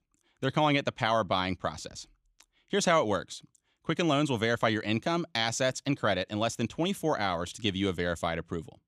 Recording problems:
none

